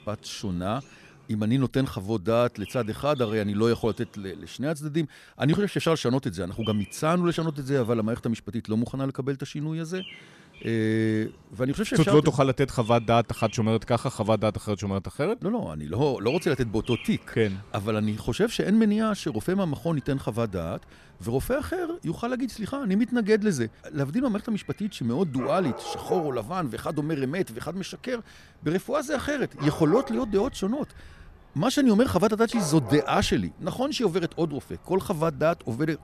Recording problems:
animal sounds; noticeable; throughout; 20 dB below the speech

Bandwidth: 14 kHz